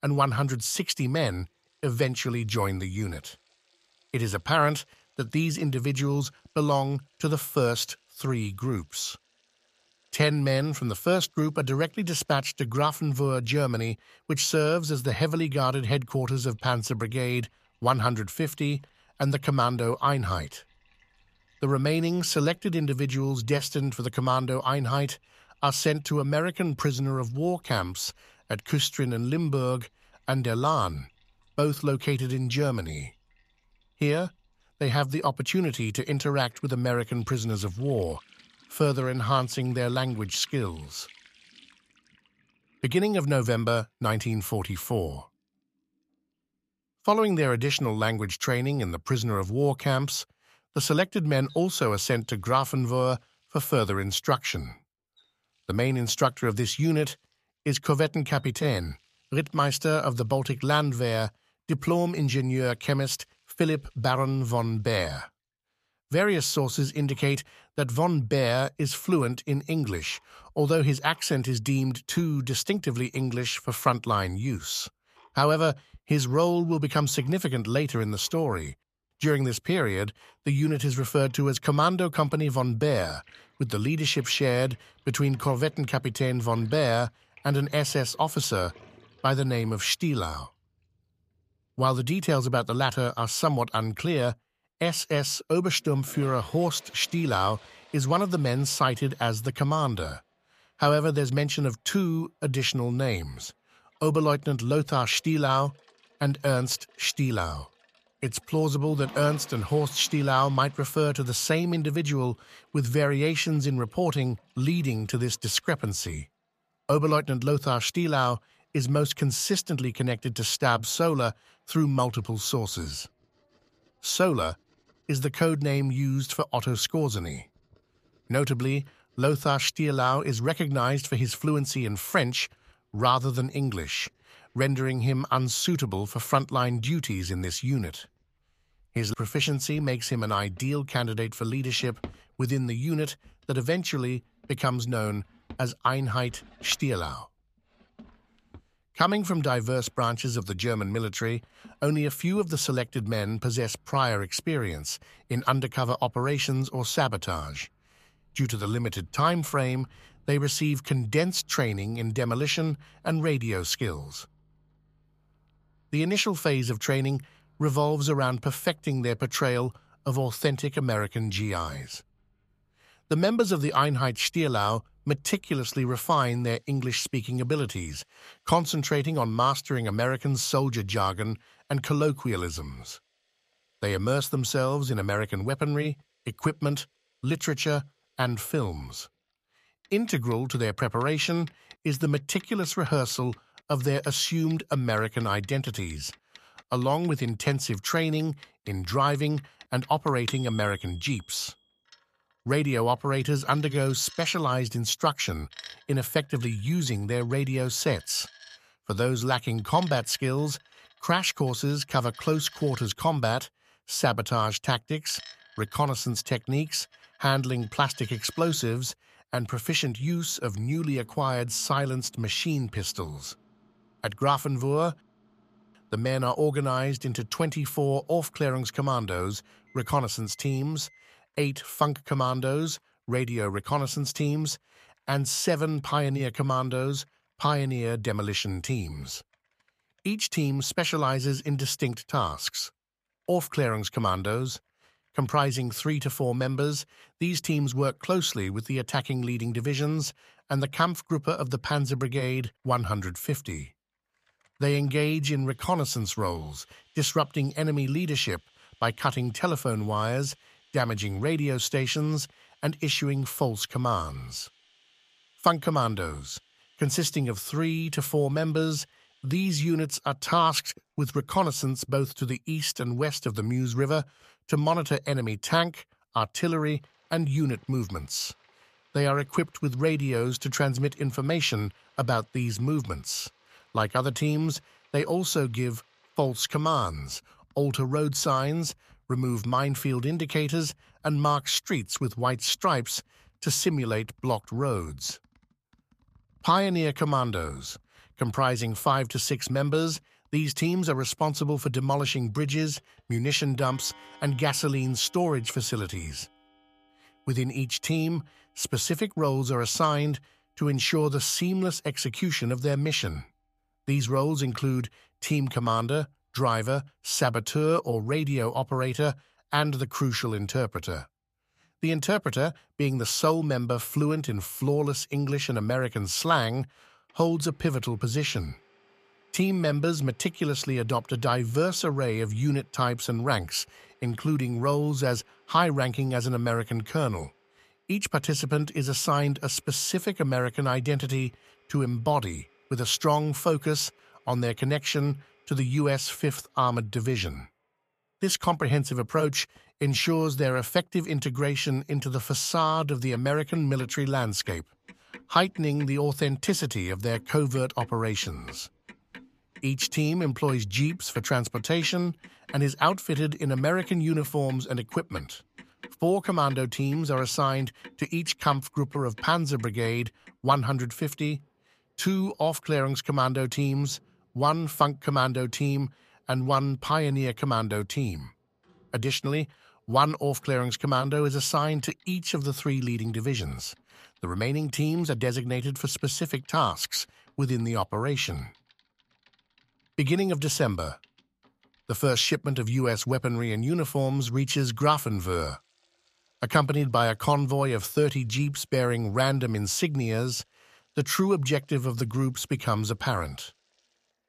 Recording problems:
household noises; faint; throughout; 25 dB below the speech

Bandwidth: 14.5 kHz